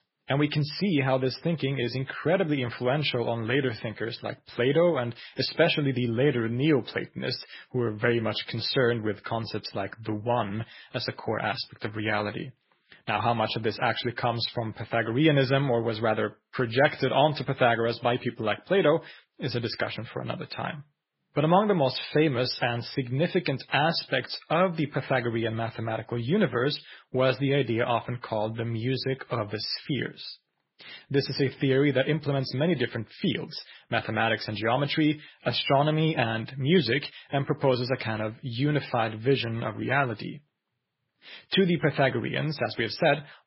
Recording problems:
garbled, watery; badly; nothing above 5.5 kHz

